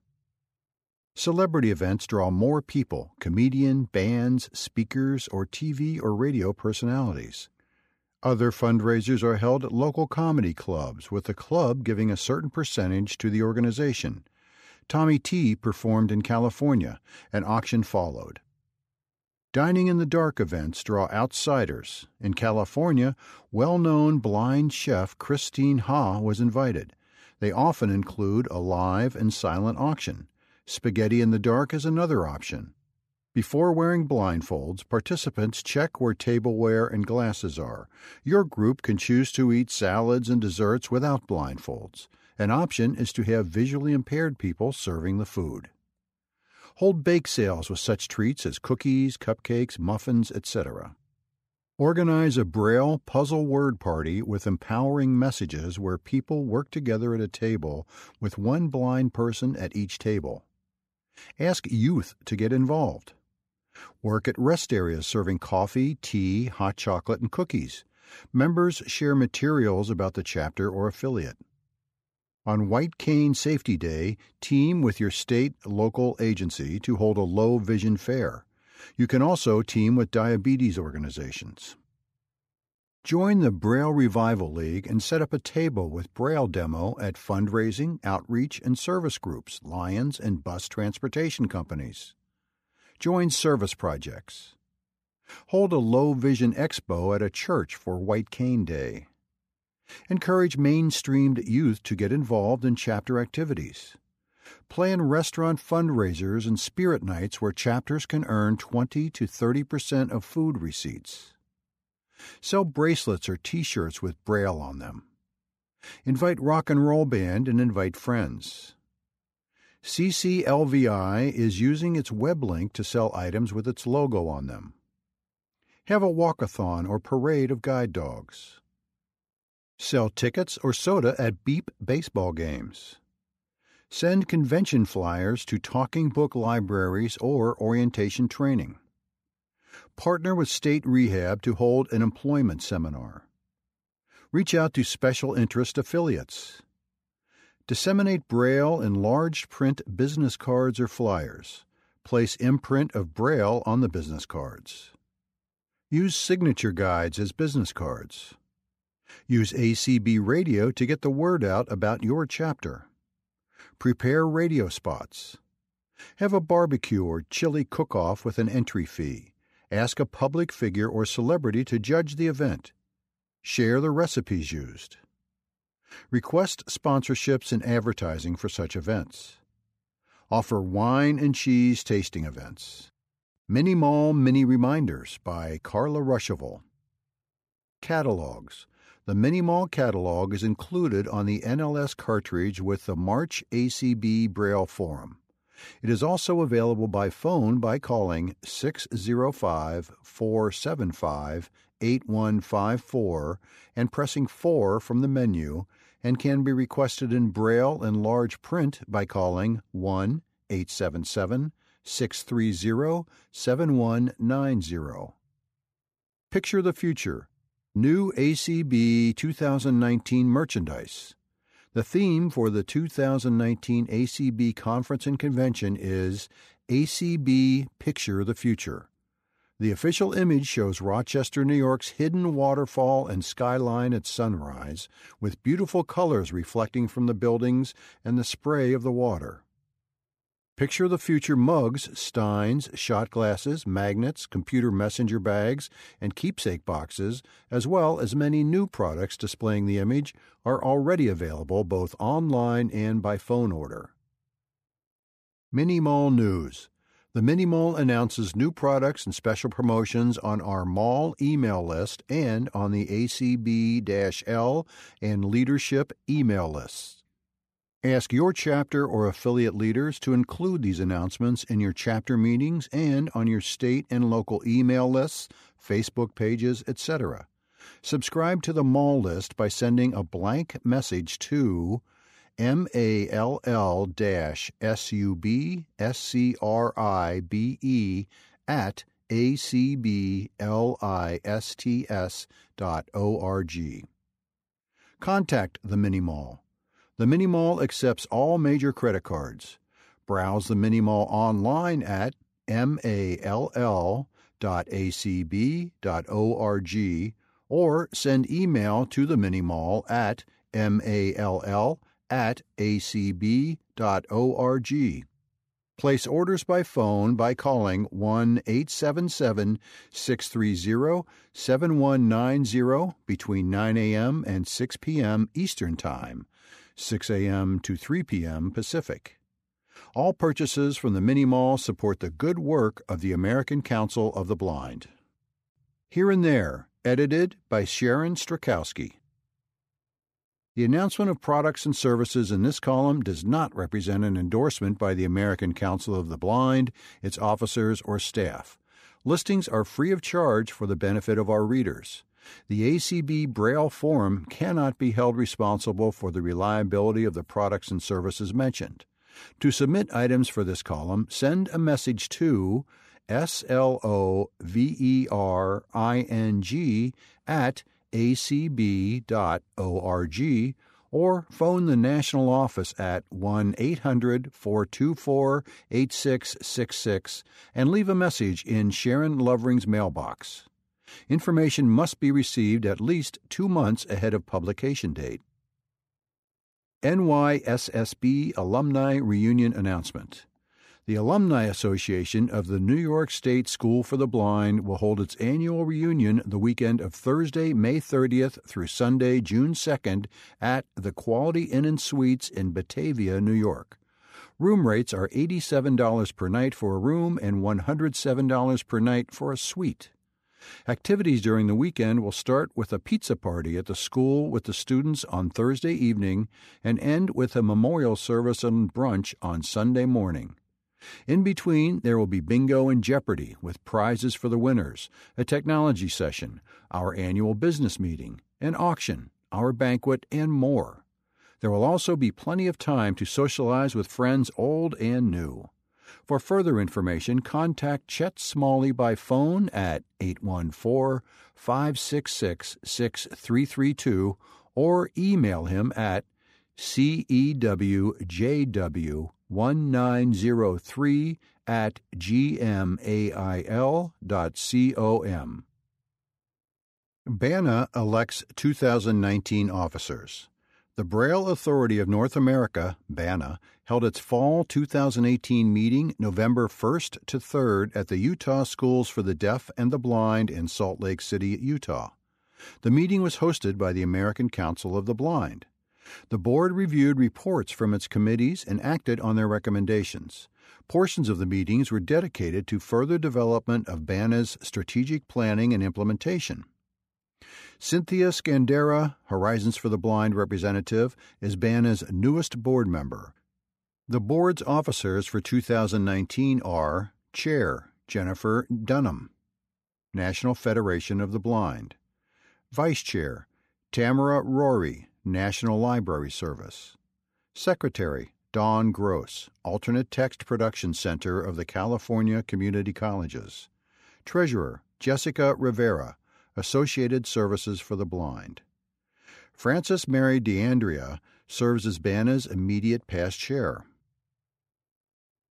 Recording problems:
none

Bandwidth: 14.5 kHz